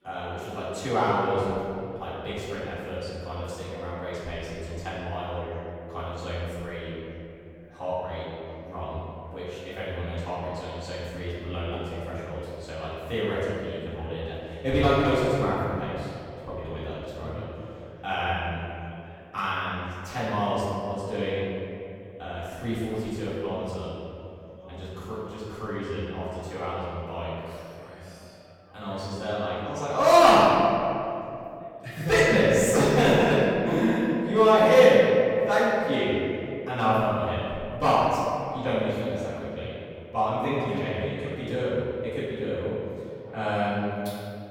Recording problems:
room echo; strong; dies away in 2.6 s
off-mic speech; far
background chatter; faint; throughout; 4 voices, 30 dB below the speech

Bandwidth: 18.5 kHz